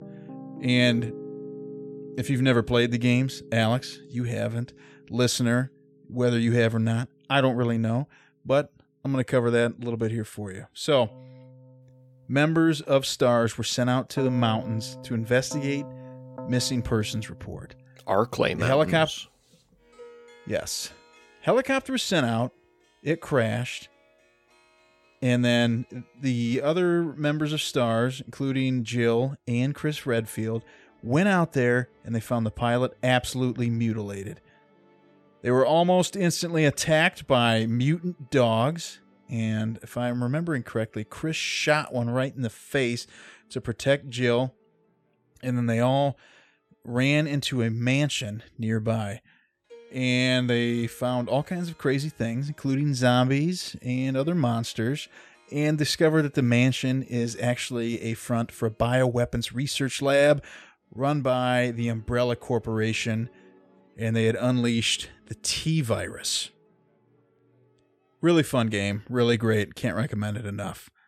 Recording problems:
background music; faint; throughout; 20 dB below the speech

